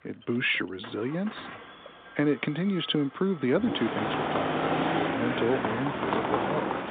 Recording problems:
phone-call audio
traffic noise; very loud; throughout; as loud as the speech

